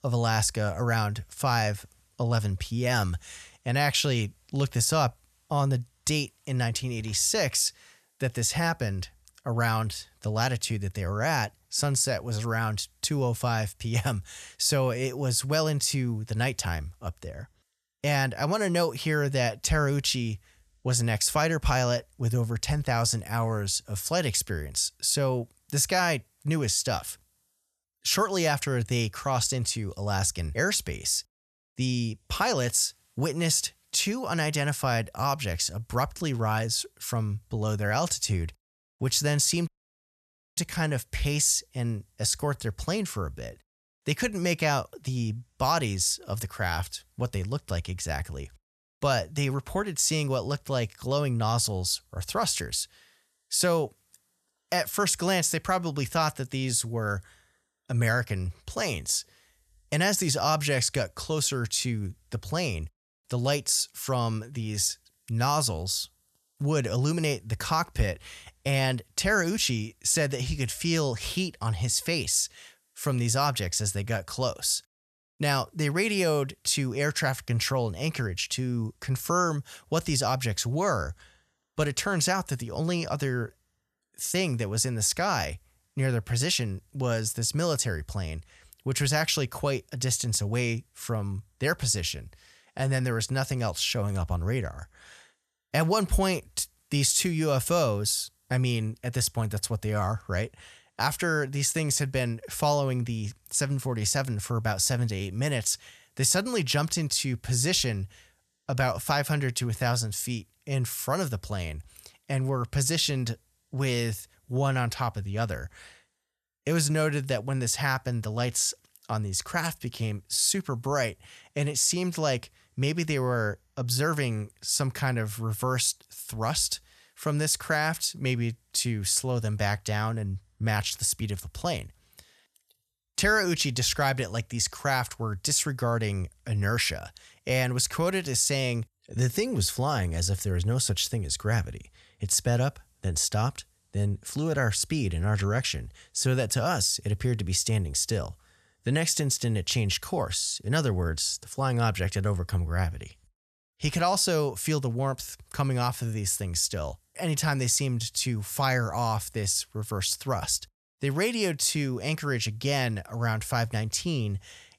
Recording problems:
audio cutting out; at 40 s for 1 s

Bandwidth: 13.5 kHz